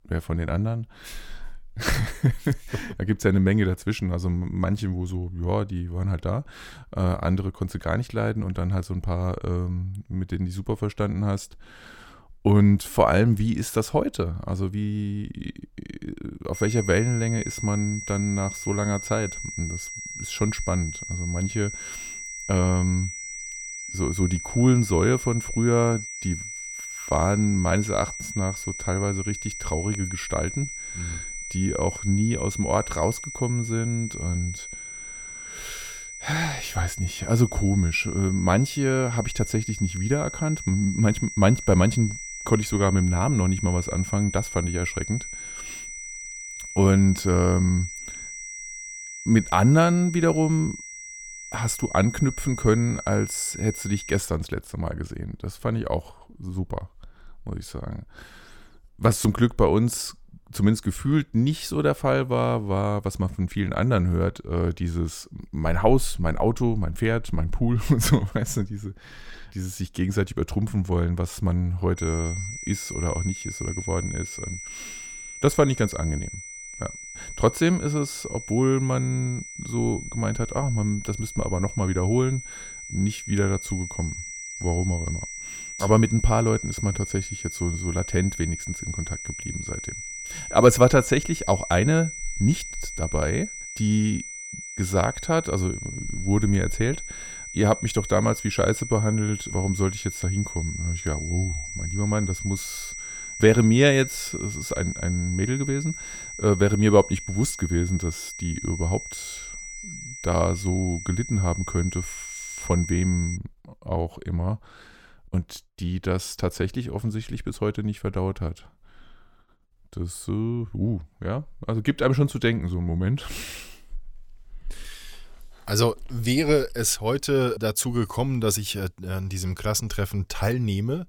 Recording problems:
high-pitched whine; loud; from 17 to 54 s and from 1:12 to 1:53; 2 kHz, 9 dB below the speech

